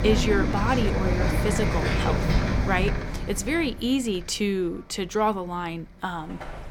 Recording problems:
traffic noise; very loud; throughout; 1 dB above the speech

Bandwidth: 17.5 kHz